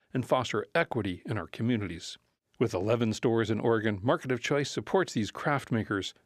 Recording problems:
none

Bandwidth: 14.5 kHz